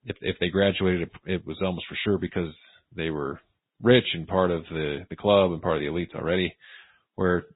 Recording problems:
high frequencies cut off; severe; nothing above 4 kHz
garbled, watery; slightly

